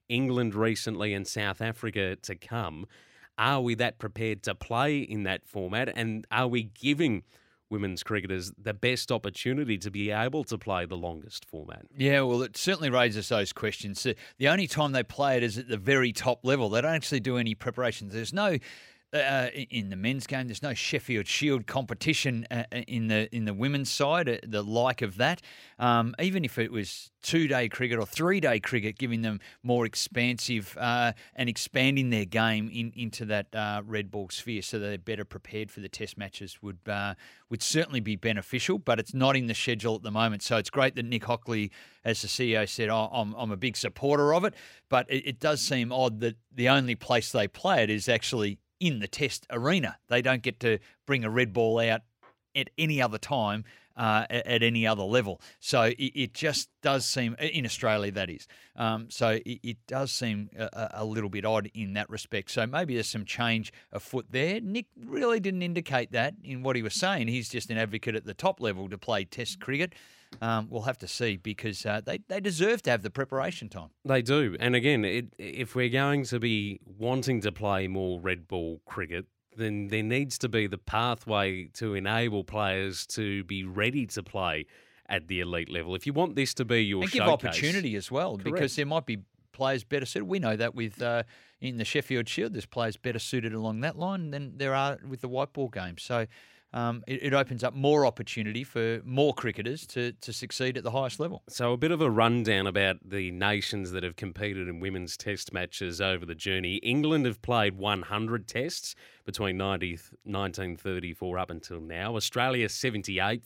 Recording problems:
none

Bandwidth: 16 kHz